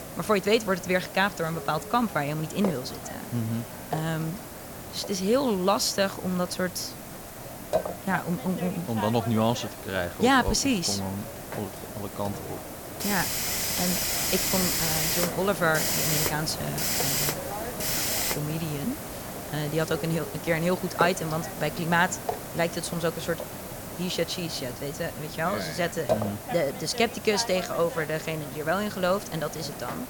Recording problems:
hiss; loud; throughout; 3 dB below the speech

